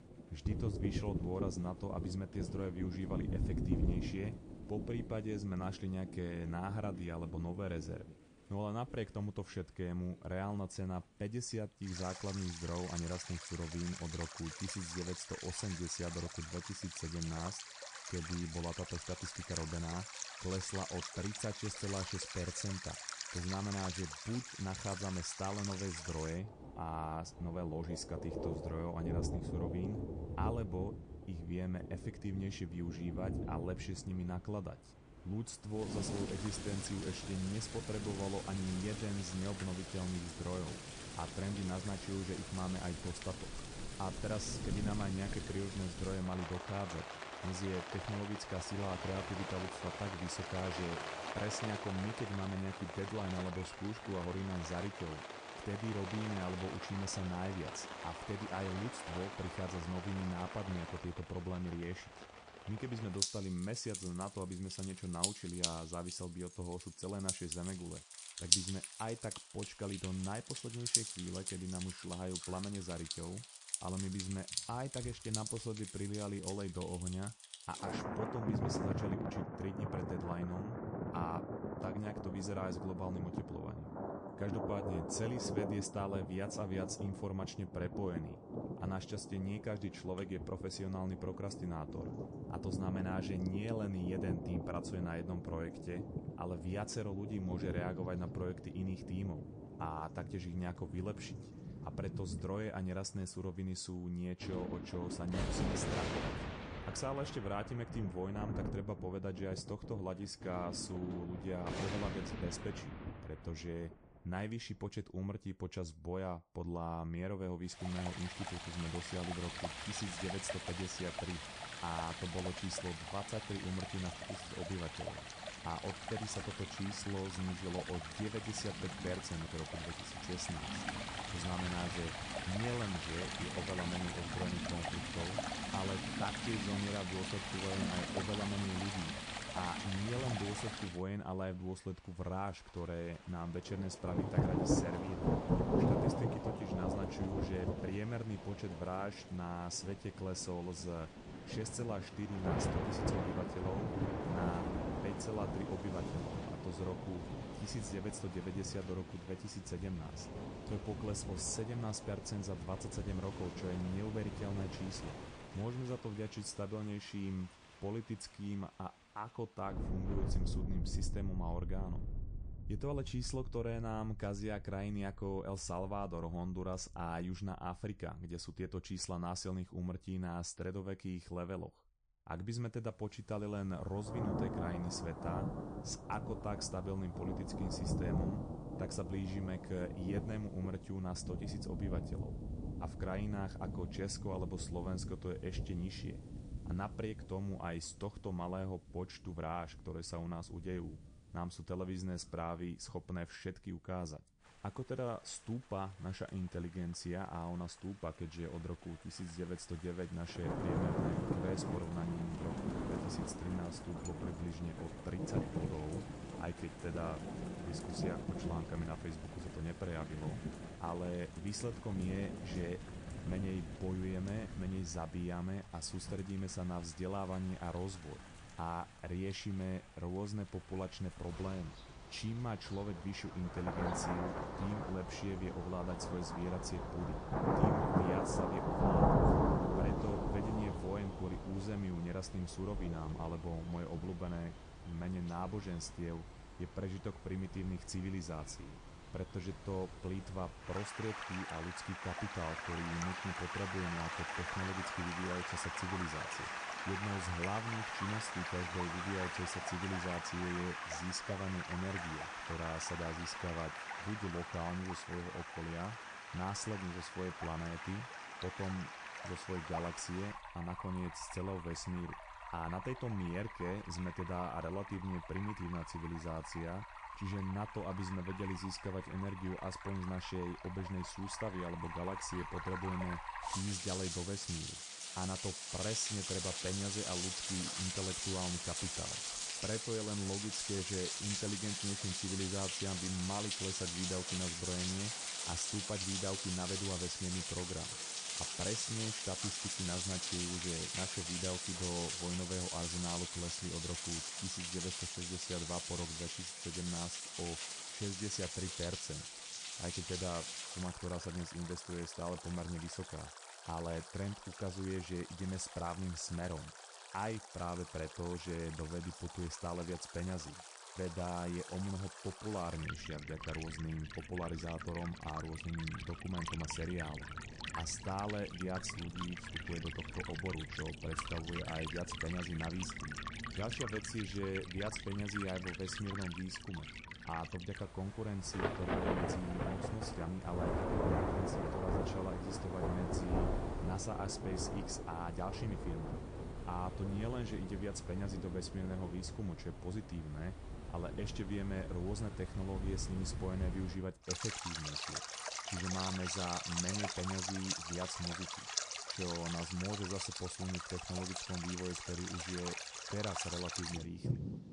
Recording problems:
garbled, watery; slightly; nothing above 9 kHz
rain or running water; loud; throughout; as loud as the speech

